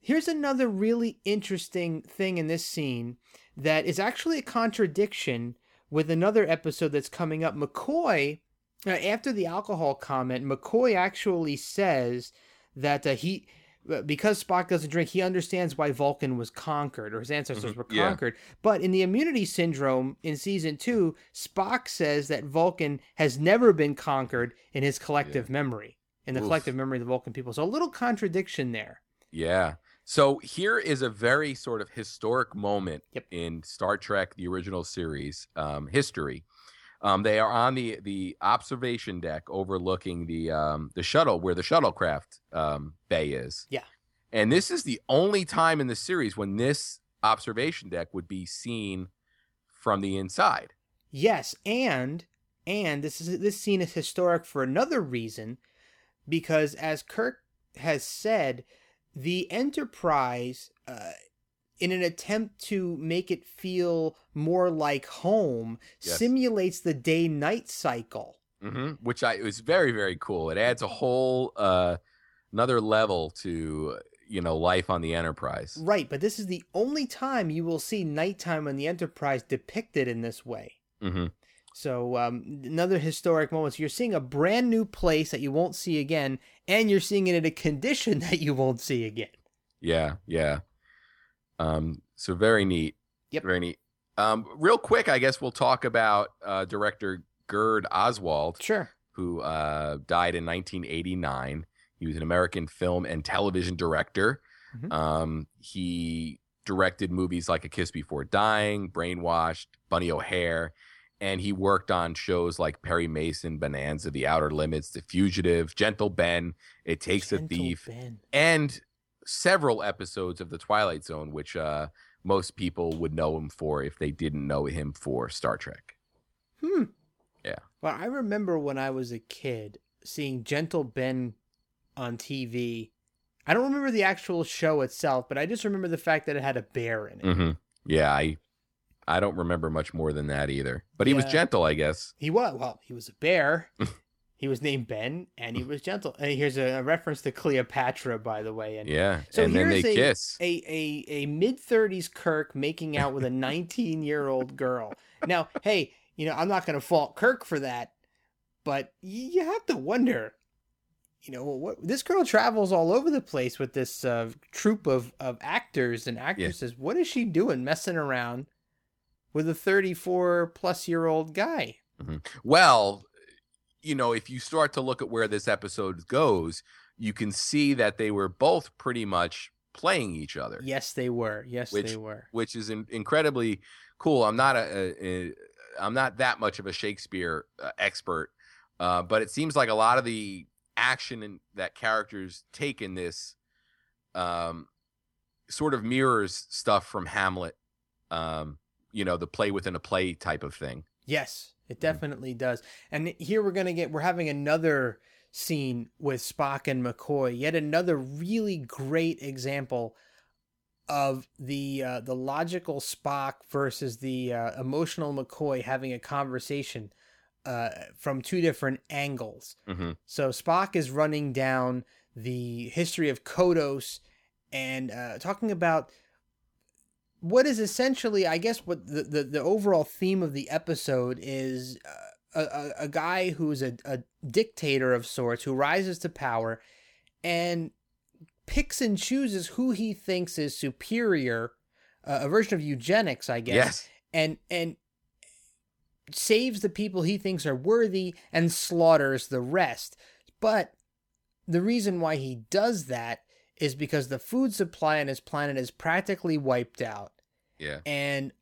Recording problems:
none

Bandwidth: 18 kHz